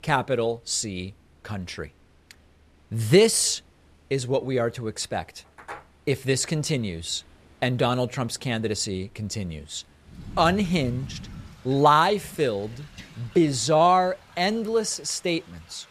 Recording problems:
rain or running water; faint; throughout; 20 dB below the speech

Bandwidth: 14.5 kHz